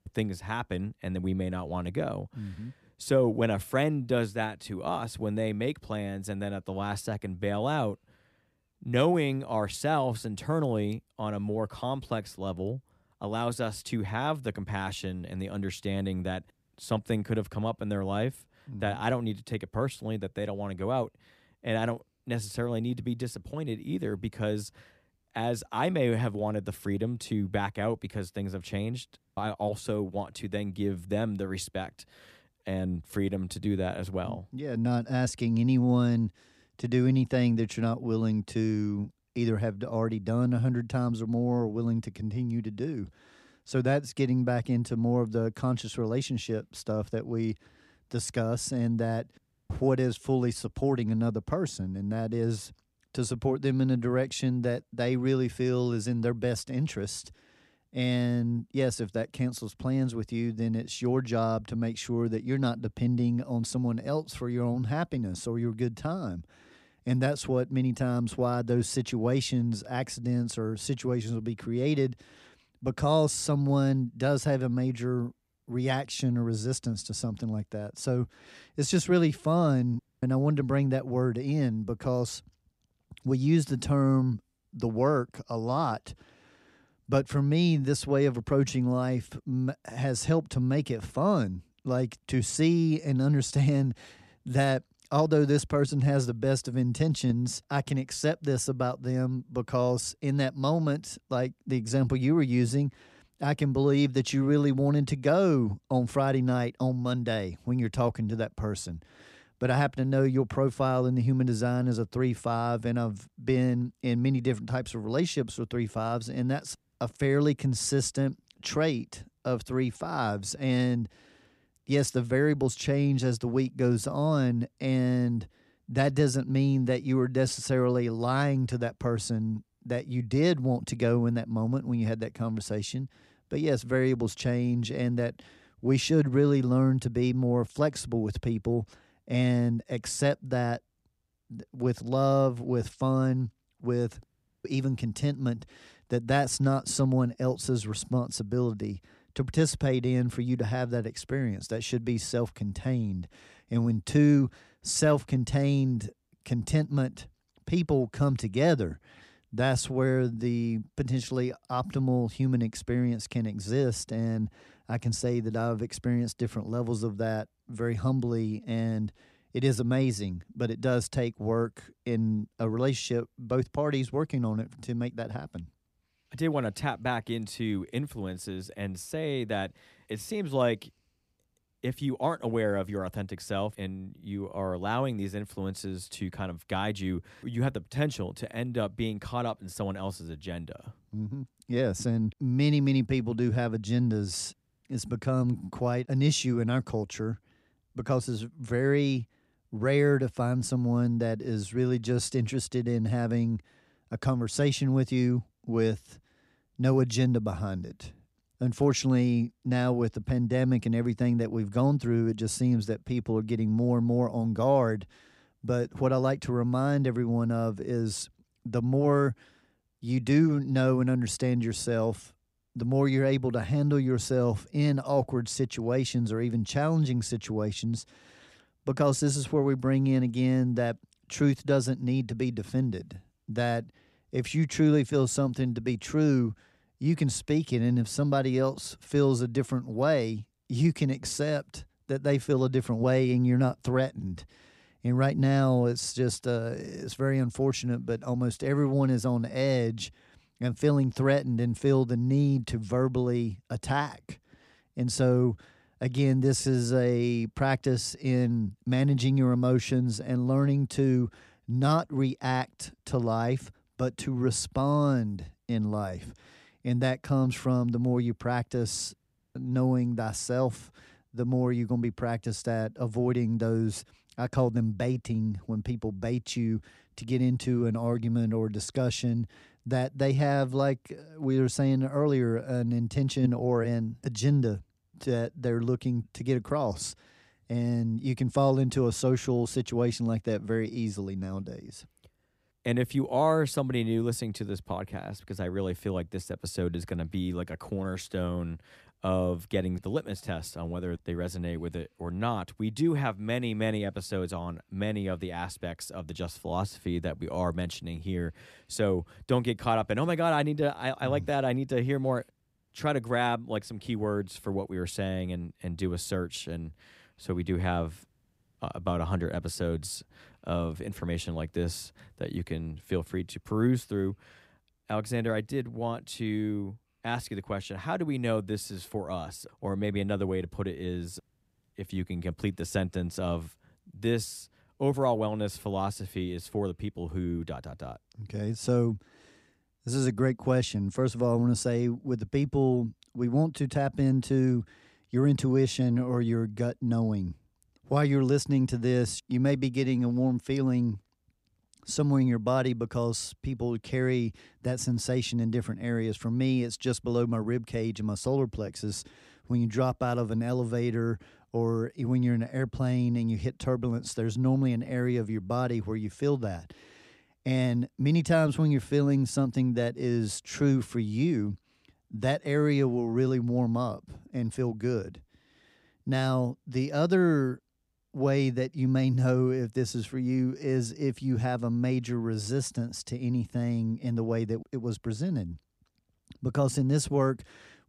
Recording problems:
none

